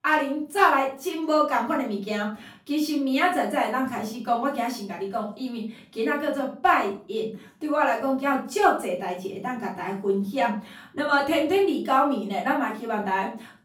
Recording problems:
off-mic speech; far
room echo; slight; dies away in 0.4 s

